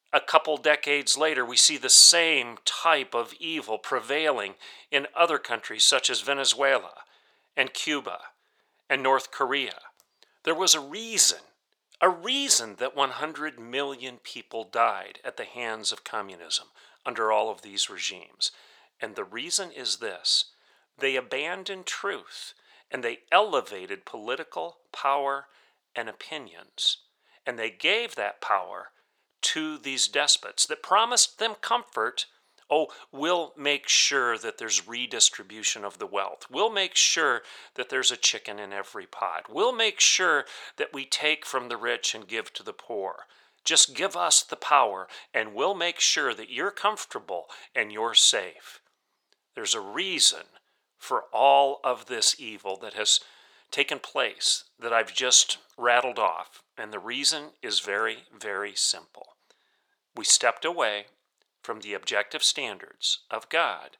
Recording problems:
thin; very; fading below 600 Hz

